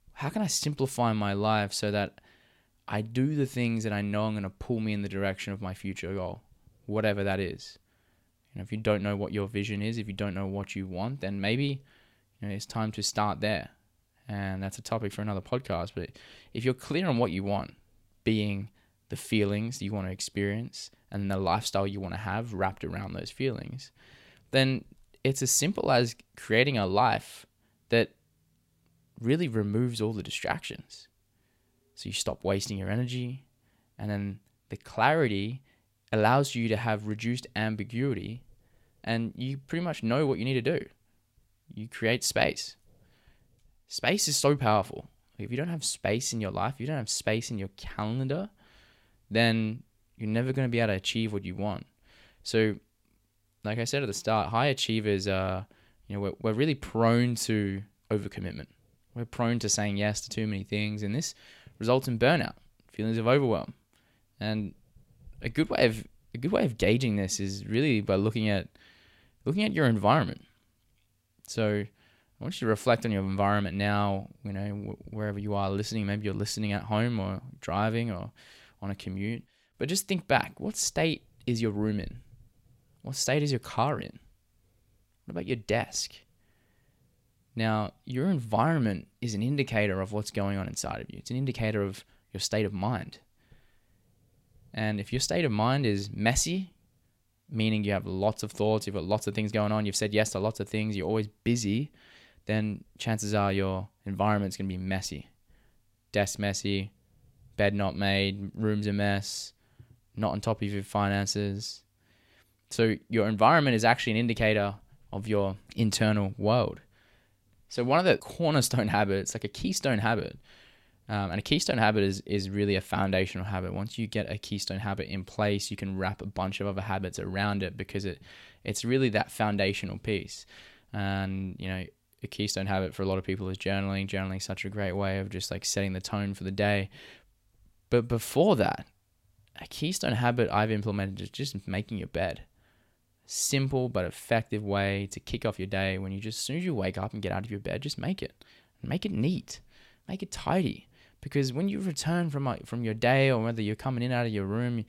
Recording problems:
none

